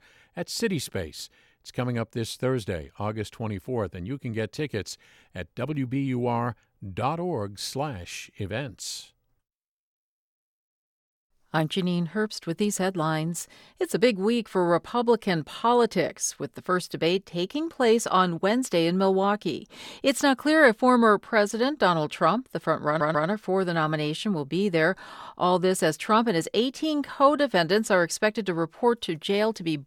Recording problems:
audio stuttering; at 23 s

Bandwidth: 17.5 kHz